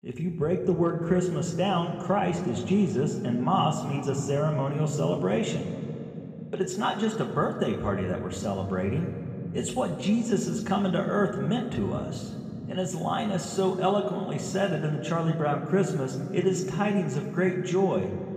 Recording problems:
room echo; slight; dies away in 3 s
off-mic speech; somewhat distant

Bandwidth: 15 kHz